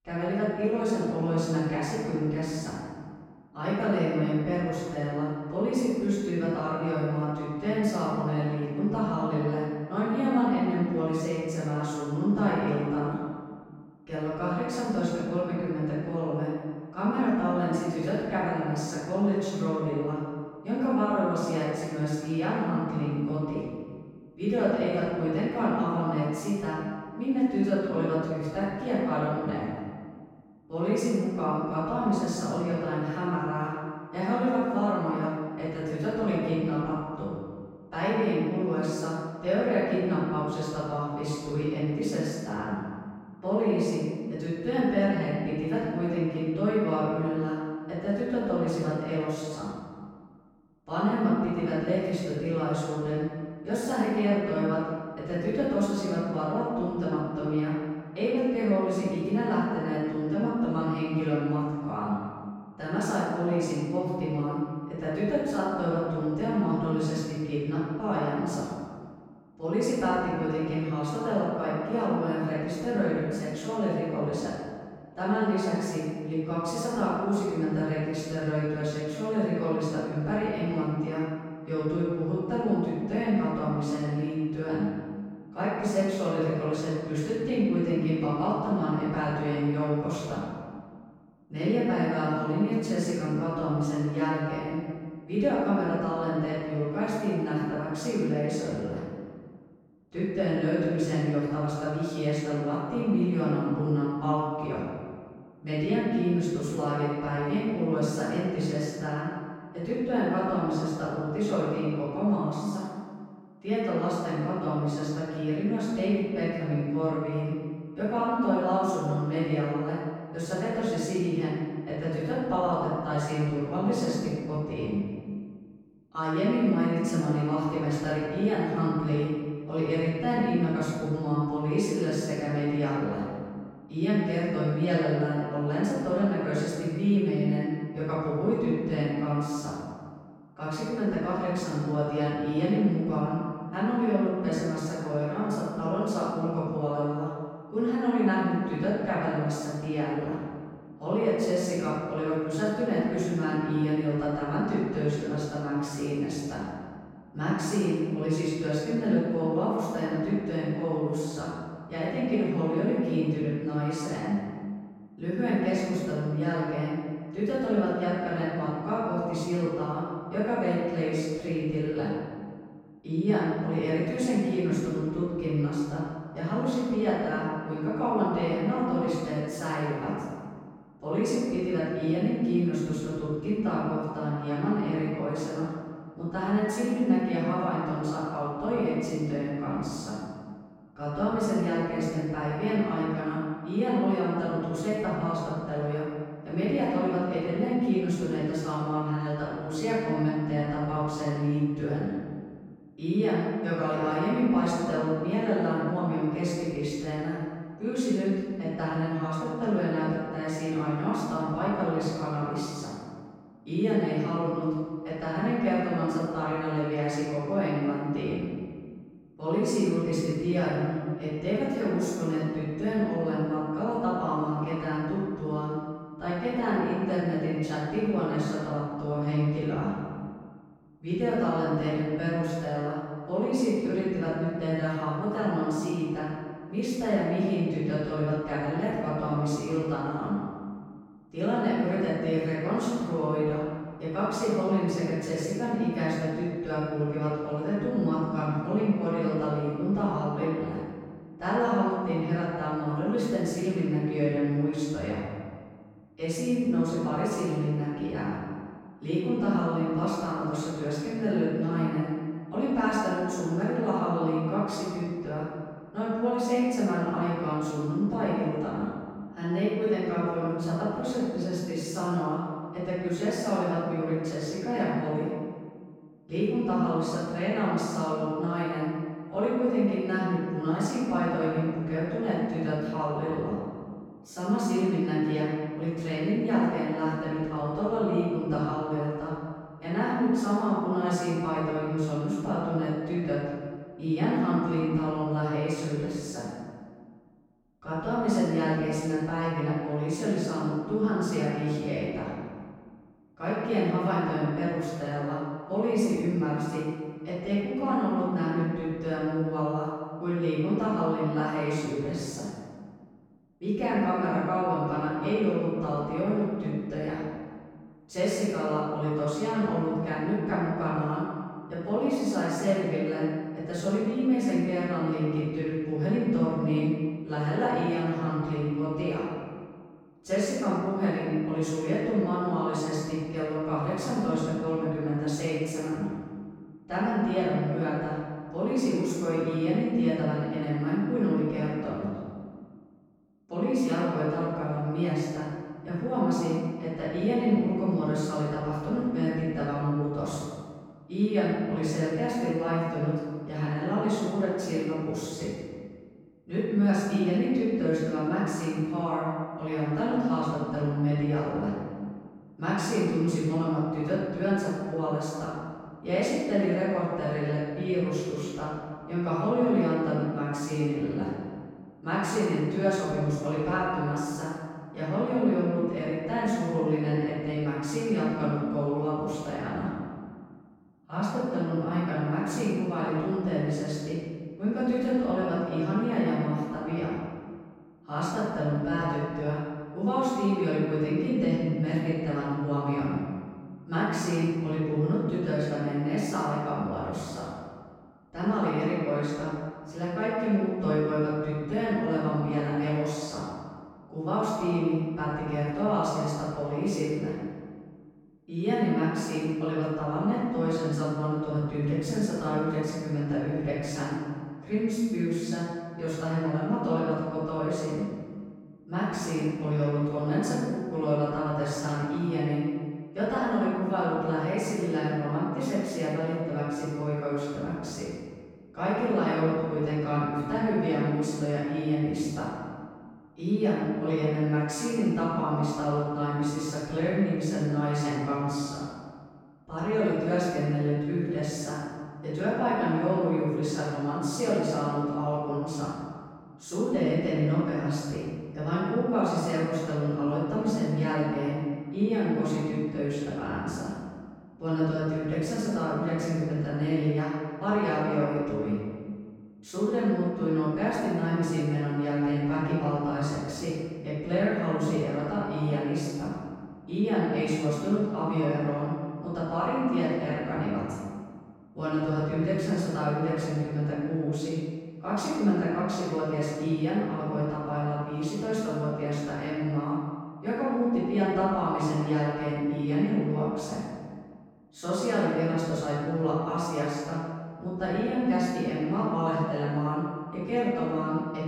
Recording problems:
room echo; strong; dies away in 1.6 s
off-mic speech; far

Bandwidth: 17.5 kHz